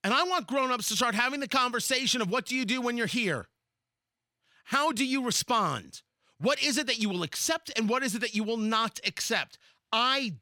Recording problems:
none

